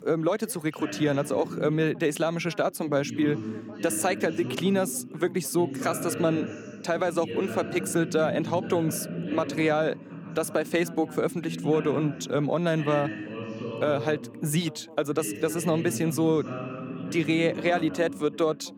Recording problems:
background chatter; loud; throughout; 2 voices, 9 dB below the speech

